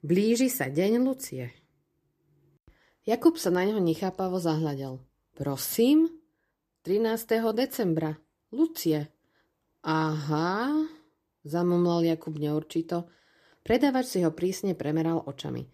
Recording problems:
none

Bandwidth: 14.5 kHz